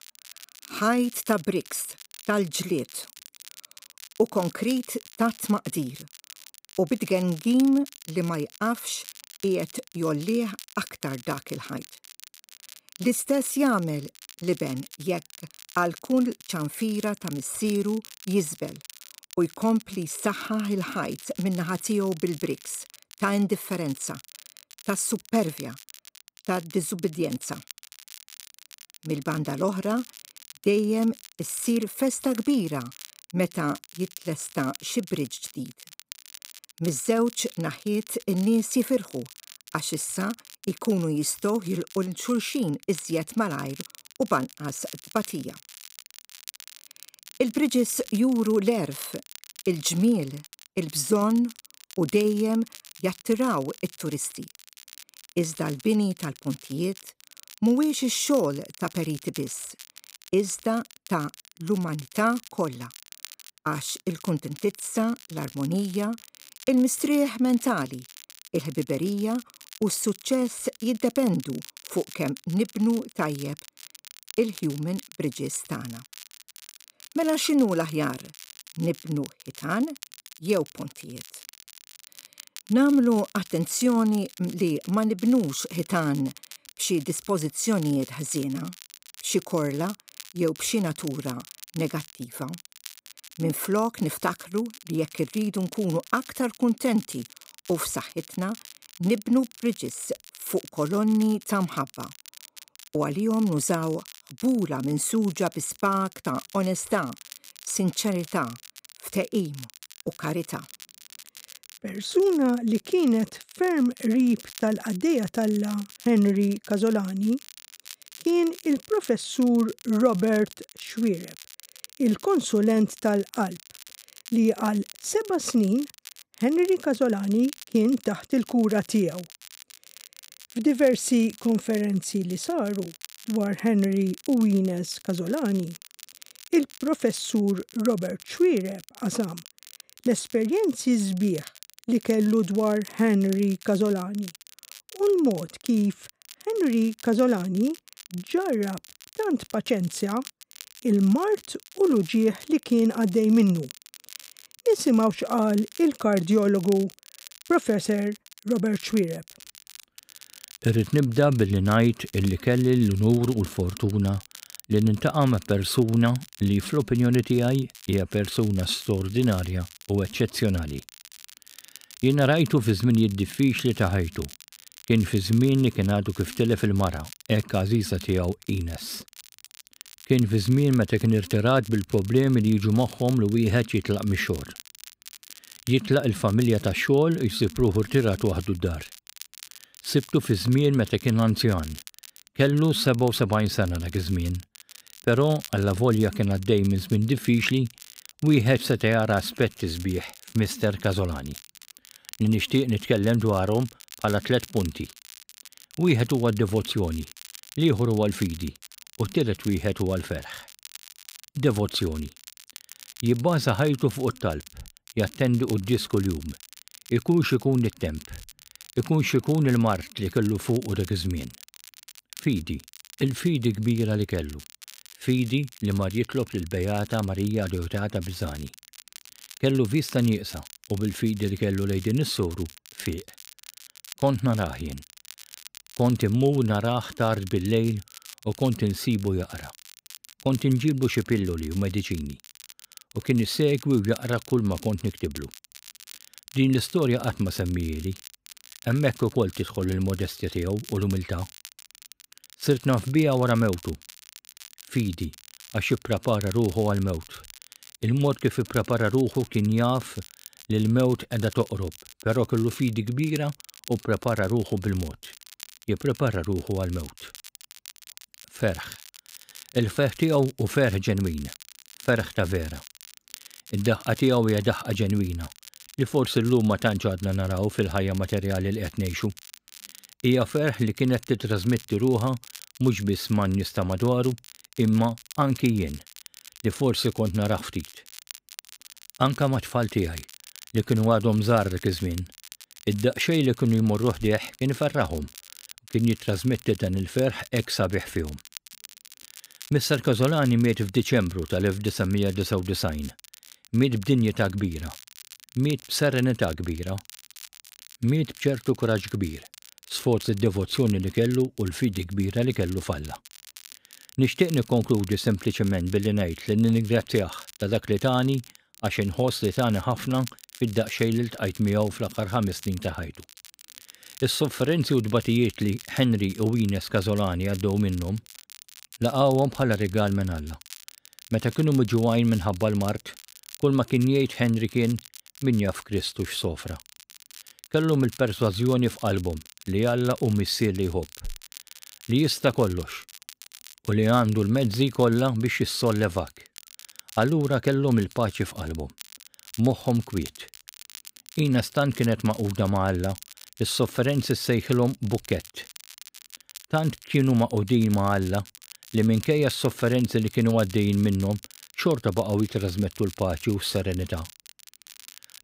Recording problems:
crackle, like an old record; noticeable; 20 dB below the speech

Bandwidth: 15.5 kHz